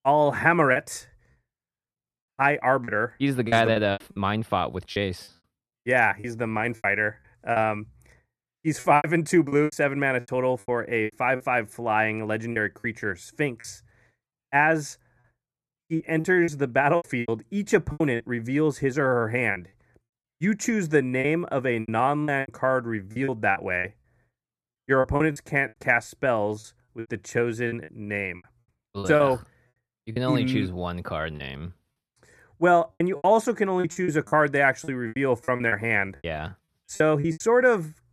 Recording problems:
choppy; very; 11% of the speech affected

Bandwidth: 13.5 kHz